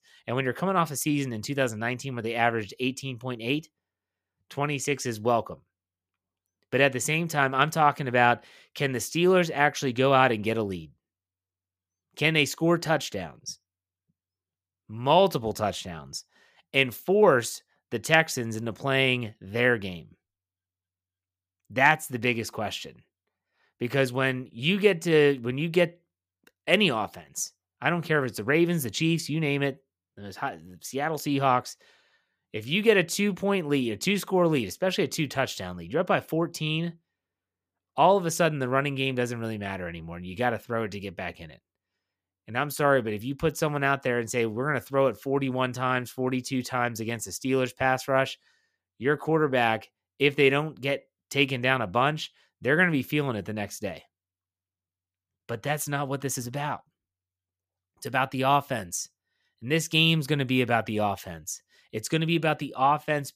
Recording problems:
none

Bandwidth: 15 kHz